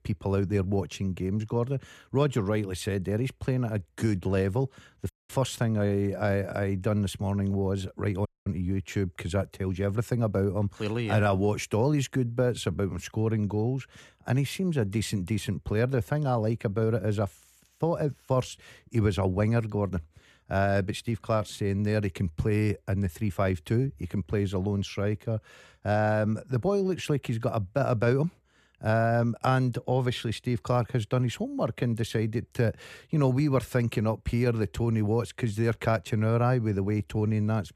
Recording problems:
audio cutting out; at 5 s and at 8.5 s

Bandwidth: 14 kHz